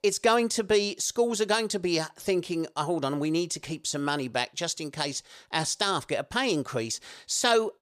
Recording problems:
none

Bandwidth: 15 kHz